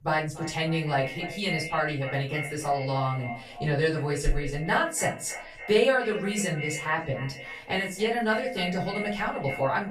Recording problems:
echo of what is said; strong; throughout; 290 ms later, 10 dB below the speech
off-mic speech; far
room echo; slight; dies away in 0.3 s

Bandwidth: 14.5 kHz